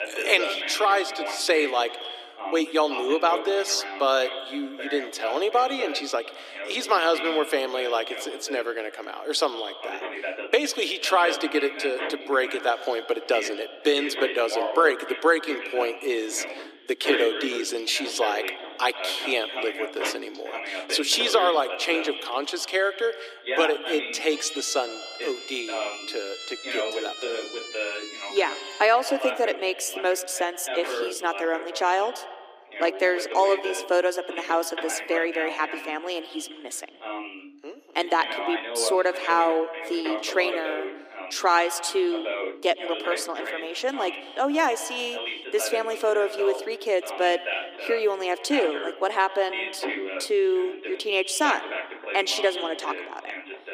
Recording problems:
echo of what is said; noticeable; throughout; 110 ms later, 15 dB below the speech
thin; somewhat; fading below 300 Hz
voice in the background; loud; throughout; 8 dB below the speech
siren; noticeable; from 24 to 29 s; peak 9 dB below the speech

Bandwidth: 15 kHz